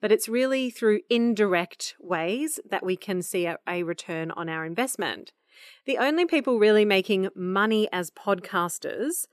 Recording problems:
none

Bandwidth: 14 kHz